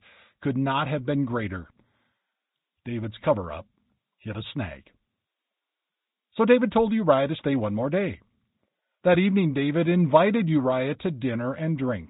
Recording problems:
high frequencies cut off; severe; nothing above 4 kHz
garbled, watery; slightly

